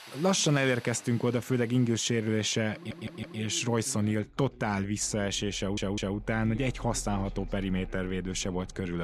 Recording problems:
machinery noise; noticeable; throughout; 20 dB below the speech
voice in the background; faint; throughout; 20 dB below the speech
audio stuttering; at 3 s and at 5.5 s
abrupt cut into speech; at the end

